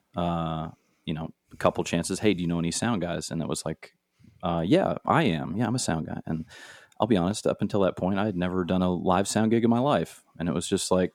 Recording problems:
none

